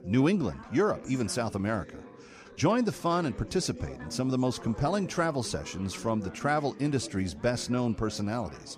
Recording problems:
chatter from many people; noticeable; throughout; 15 dB below the speech

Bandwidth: 15 kHz